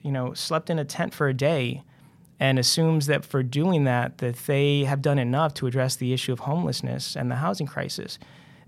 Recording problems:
none

